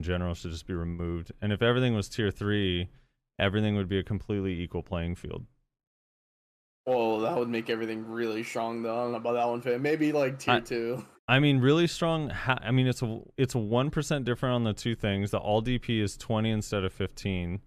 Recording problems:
abrupt cut into speech; at the start

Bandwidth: 14.5 kHz